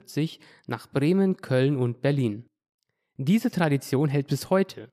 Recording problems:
none

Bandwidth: 14.5 kHz